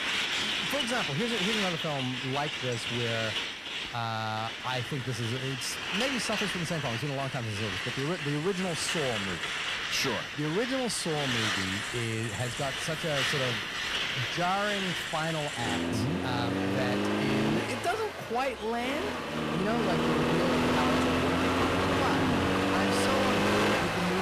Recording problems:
distortion; slight; 9% of the sound clipped
traffic noise; very loud; throughout; 3 dB above the speech
abrupt cut into speech; at the end

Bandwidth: 14.5 kHz